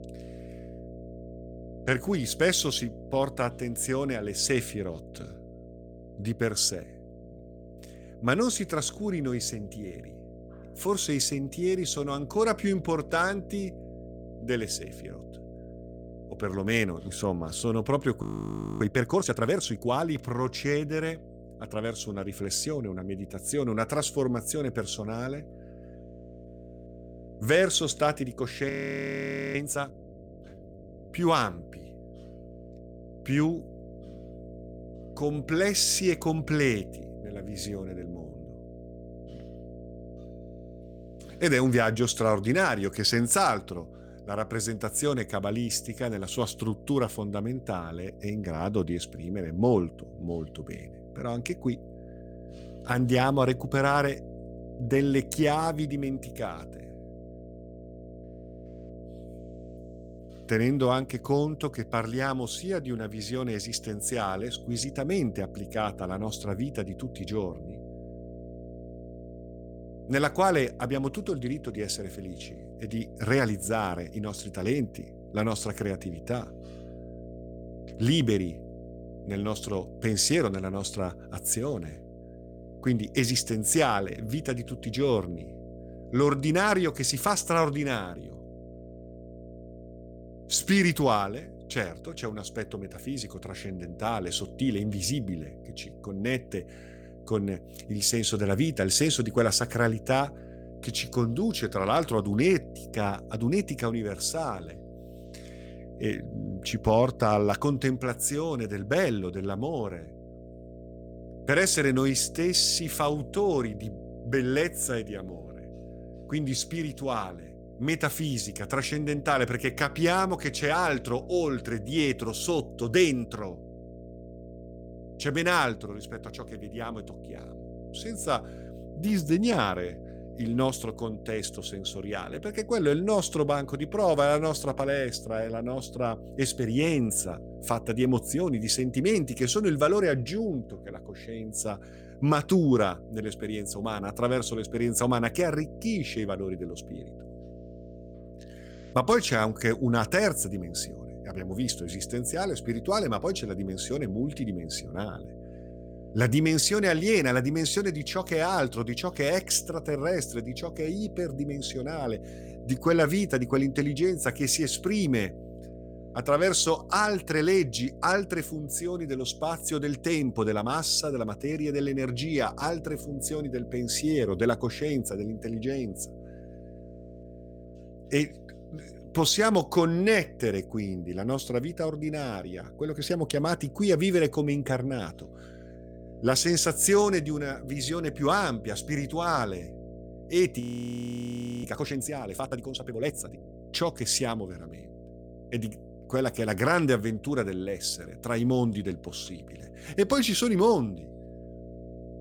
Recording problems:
electrical hum; noticeable; throughout; 60 Hz, 20 dB below the speech
audio freezing; at 18 s for 0.5 s, at 29 s for 1 s and at 3:11 for 1 s

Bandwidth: 18 kHz